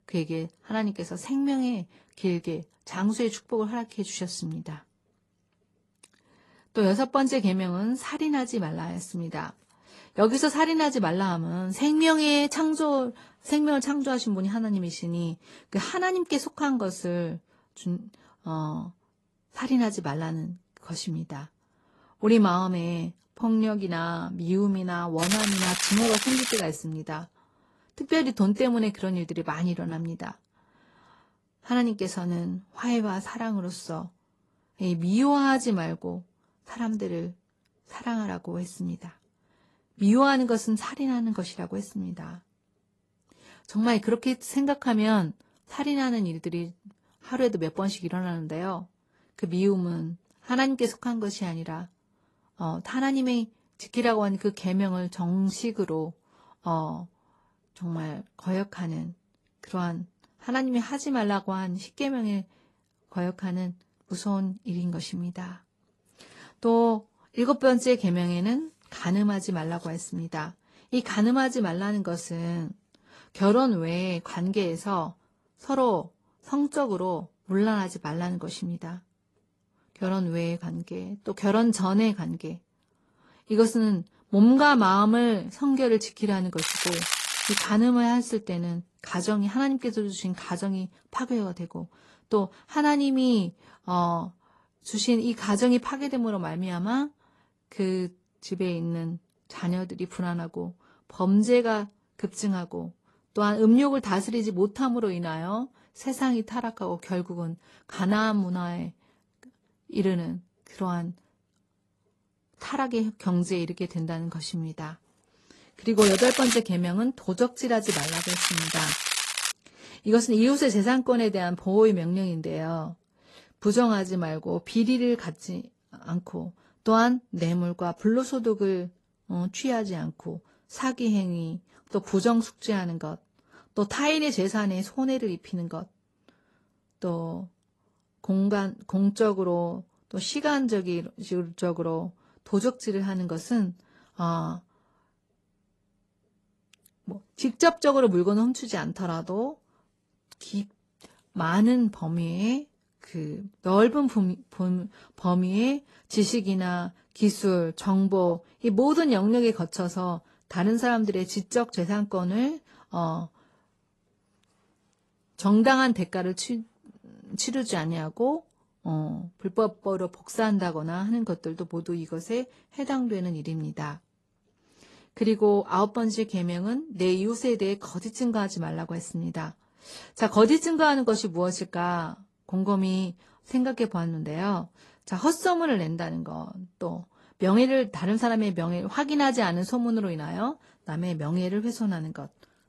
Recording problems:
garbled, watery; slightly; nothing above 11.5 kHz
crackling; loud; 4 times, first at 25 s; 1 dB below the speech

